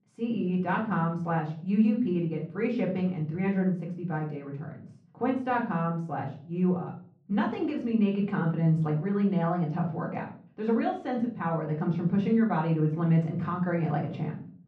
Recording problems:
off-mic speech; far
muffled; very; fading above 1.5 kHz
room echo; slight; dies away in 0.4 s

